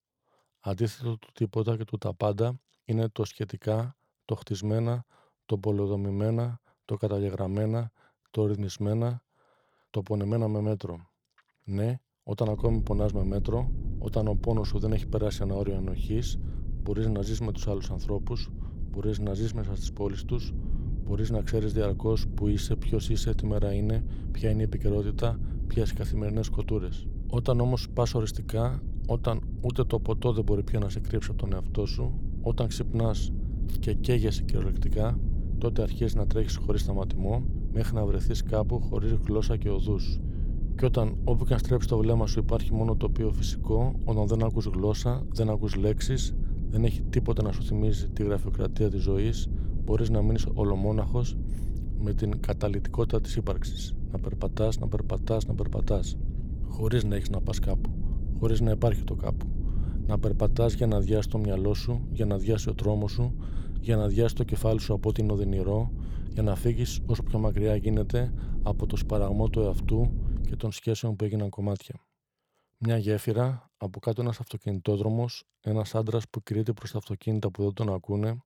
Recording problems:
low rumble; noticeable; from 13 s to 1:11; 15 dB below the speech

